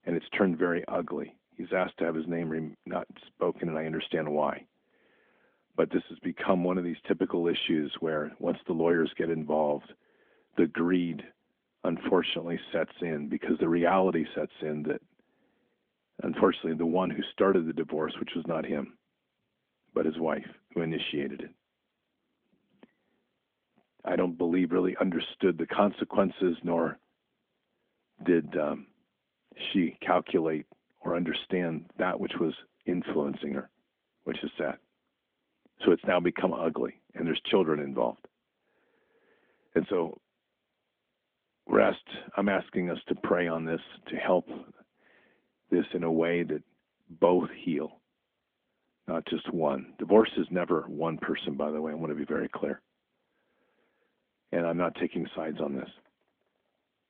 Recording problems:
phone-call audio; nothing above 3.5 kHz

